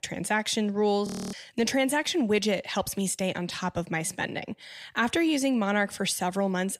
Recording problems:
audio freezing; at 1 s

